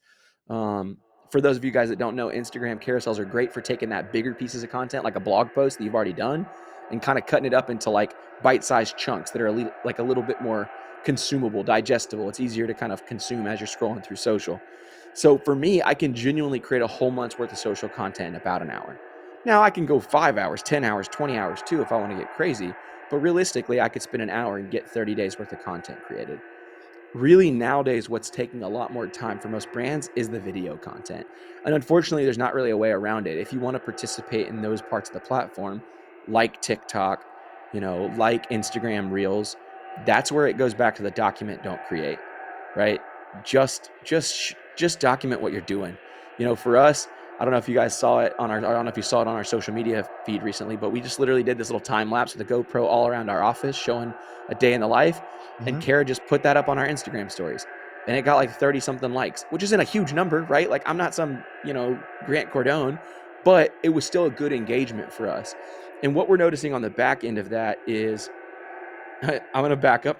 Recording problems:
echo of what is said; noticeable; throughout; 480 ms later, 15 dB below the speech

